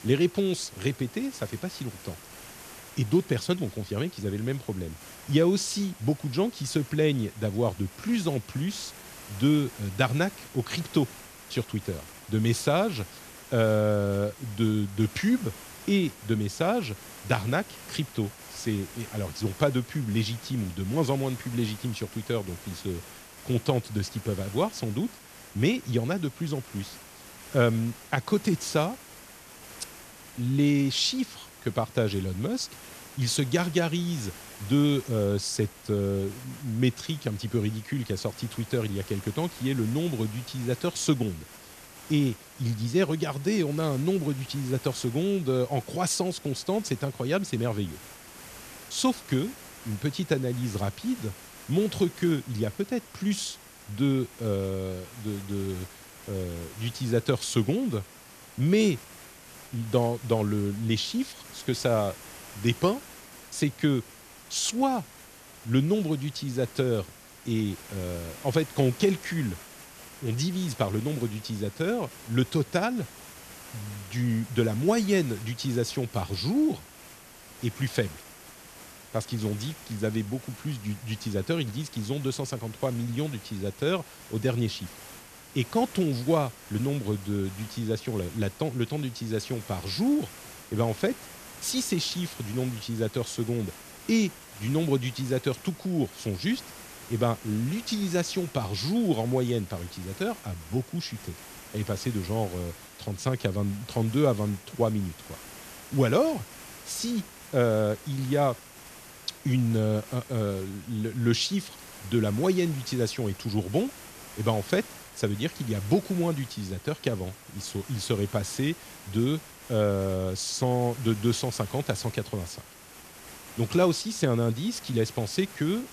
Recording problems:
hiss; noticeable; throughout; 15 dB below the speech

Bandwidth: 14 kHz